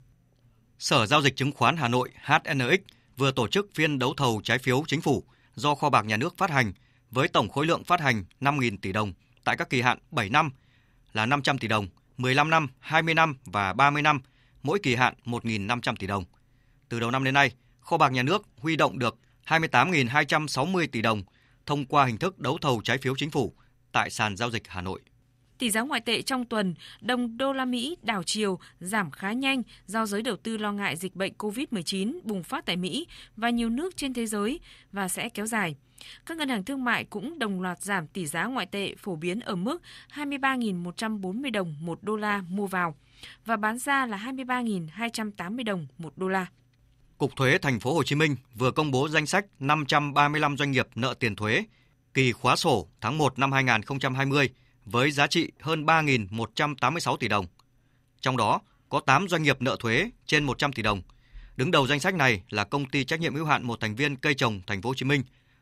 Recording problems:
none

